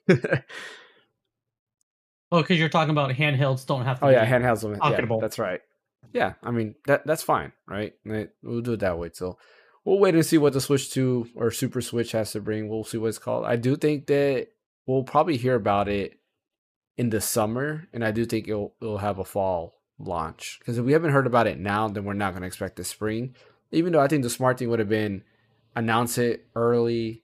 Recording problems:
none

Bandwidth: 15 kHz